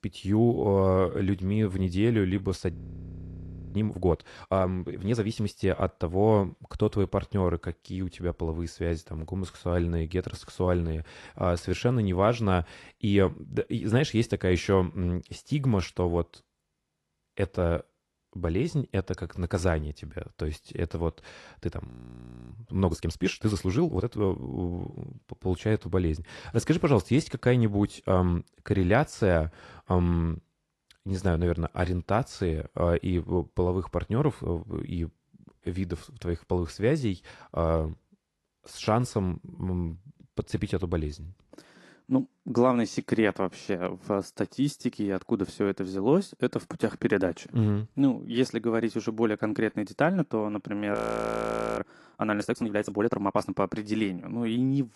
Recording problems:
garbled, watery; slightly; nothing above 11.5 kHz
audio freezing; at 2.5 s for 1 s, at 22 s for 0.5 s and at 51 s for 1 s

